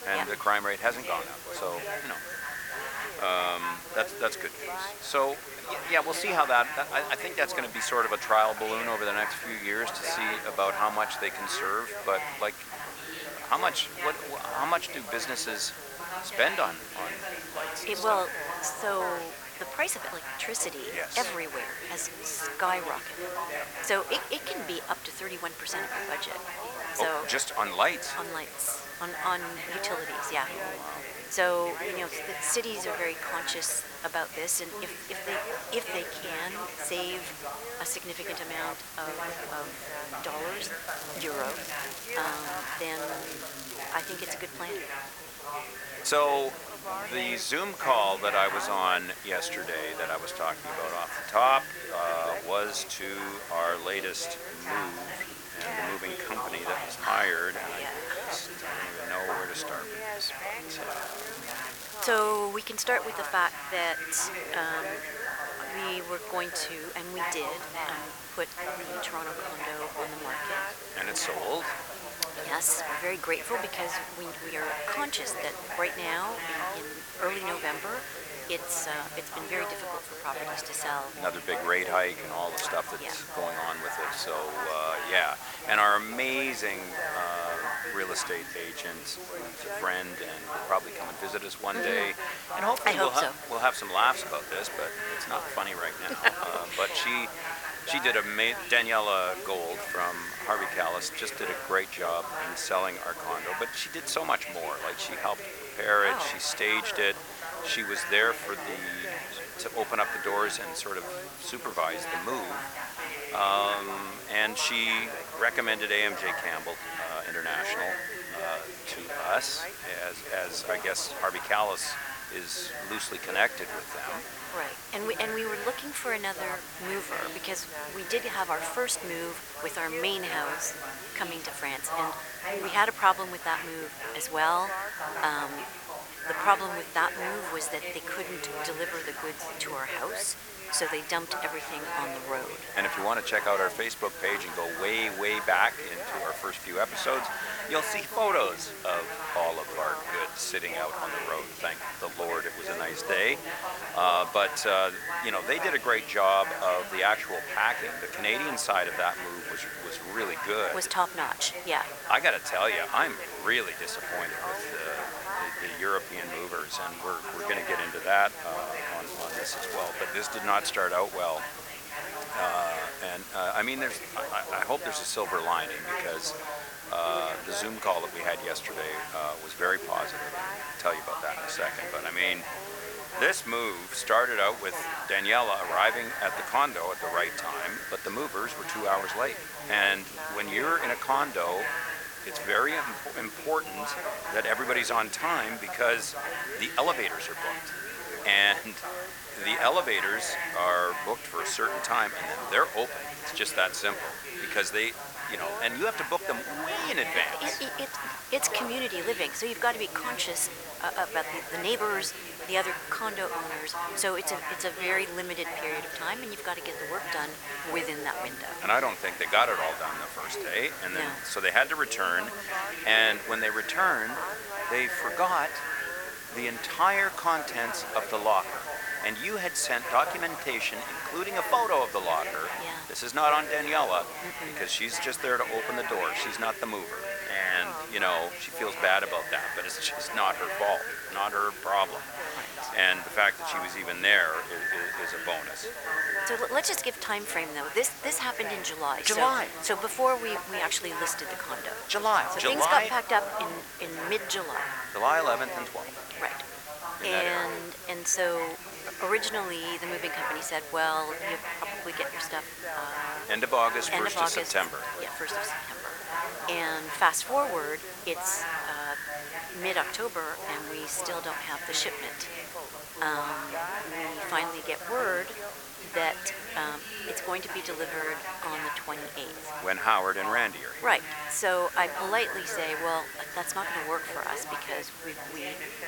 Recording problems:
thin; very; fading below 650 Hz
echo of what is said; noticeable; throughout; 590 ms later, 10 dB below the speech
background chatter; loud; throughout; 3 voices, 8 dB below the speech
hiss; noticeable; throughout; 10 dB below the speech
crackling; noticeable; from 41 to 44 s, from 1:01 to 1:02 and at 2:49; 10 dB below the speech

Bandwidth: 18.5 kHz